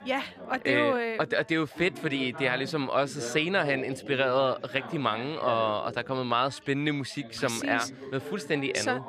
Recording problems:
background chatter; noticeable; throughout; 3 voices, 15 dB below the speech

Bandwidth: 14.5 kHz